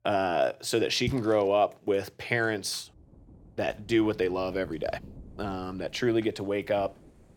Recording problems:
rain or running water; noticeable; throughout; 20 dB below the speech

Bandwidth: 18 kHz